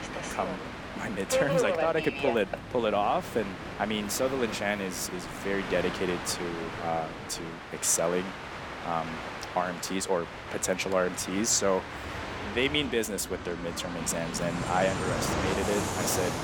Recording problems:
train or aircraft noise; loud; throughout; 5 dB below the speech

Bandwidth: 18 kHz